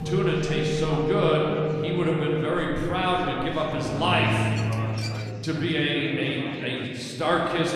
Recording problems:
room echo; noticeable; dies away in 2.5 s
off-mic speech; somewhat distant
background music; loud; until 5 s; 3 dB below the speech
chatter from many people; noticeable; throughout; 15 dB below the speech
clattering dishes; faint; at 4.5 s; peak 10 dB below the speech

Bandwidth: 14.5 kHz